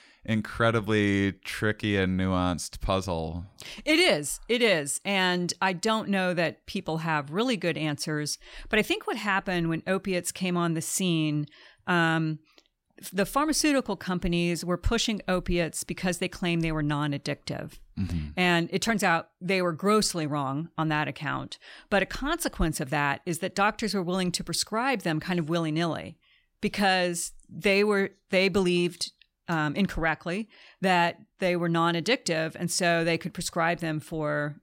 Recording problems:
none

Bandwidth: 16 kHz